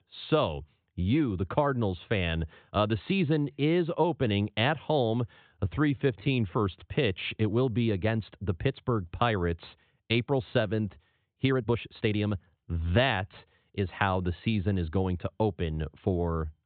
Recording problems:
high frequencies cut off; severe; nothing above 4 kHz
uneven, jittery; strongly; from 5.5 to 14 s

